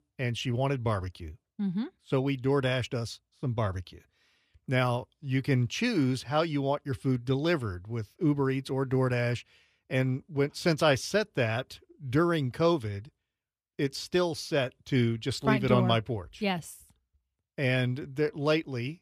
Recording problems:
none

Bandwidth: 14.5 kHz